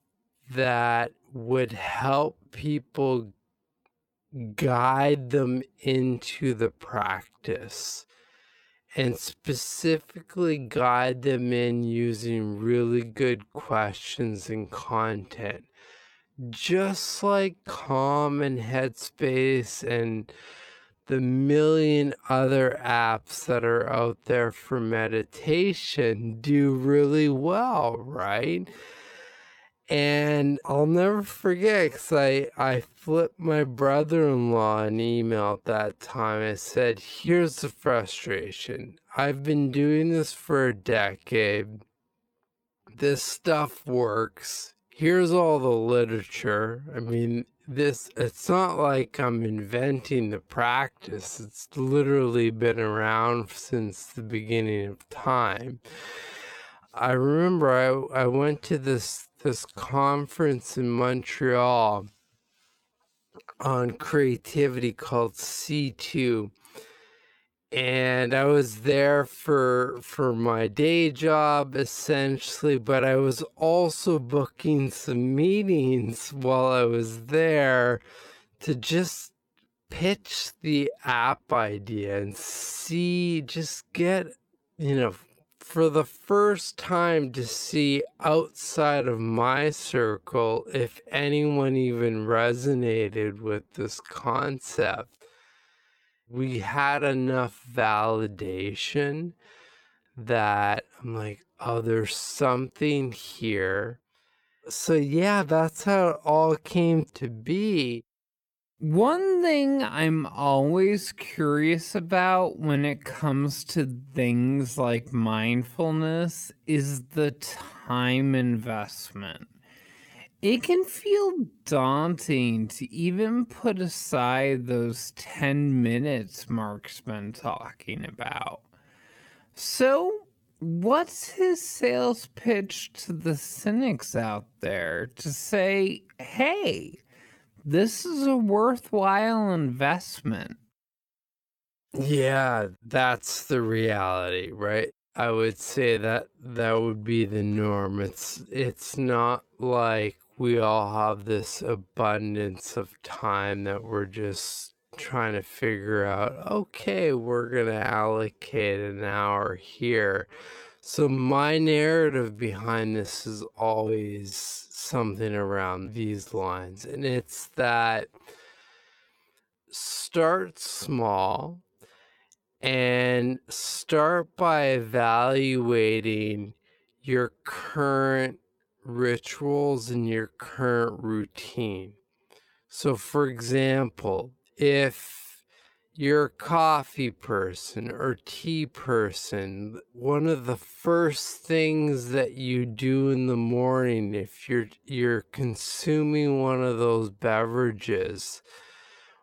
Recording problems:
wrong speed, natural pitch; too slow; 0.5 times normal speed

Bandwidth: 18.5 kHz